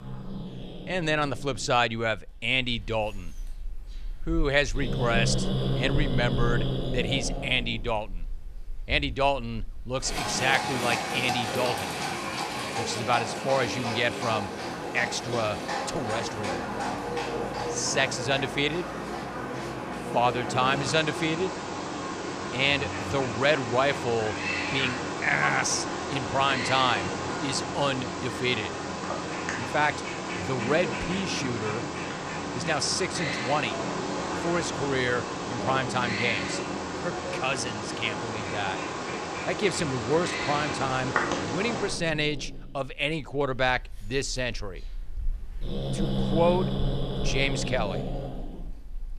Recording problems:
animal sounds; loud; throughout; 3 dB below the speech

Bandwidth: 14.5 kHz